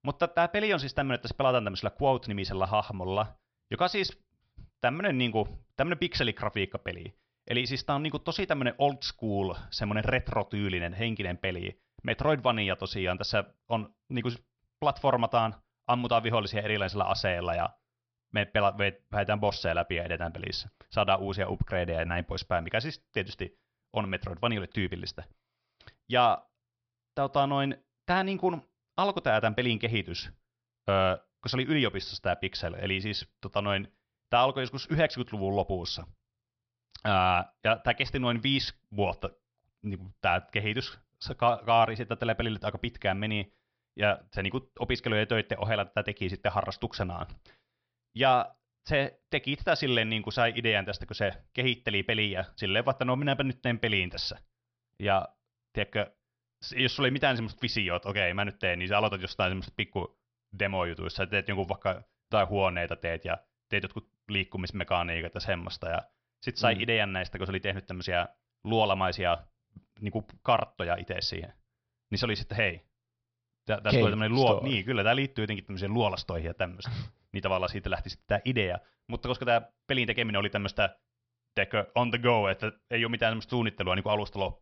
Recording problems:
high frequencies cut off; noticeable; nothing above 5.5 kHz

